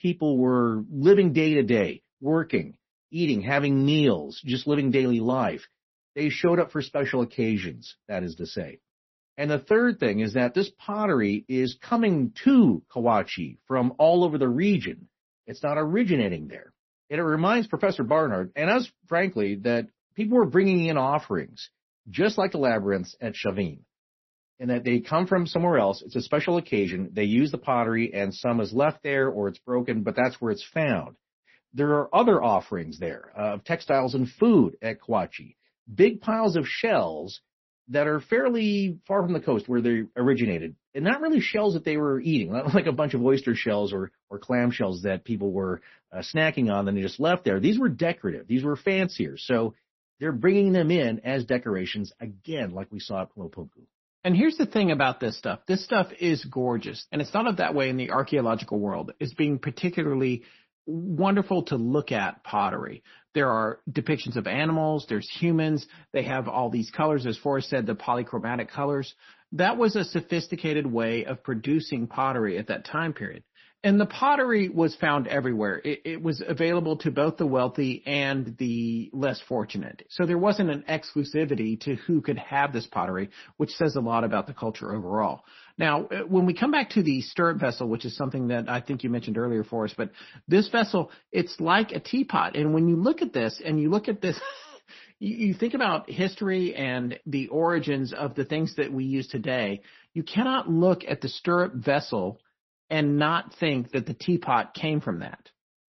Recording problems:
garbled, watery; slightly; nothing above 6 kHz

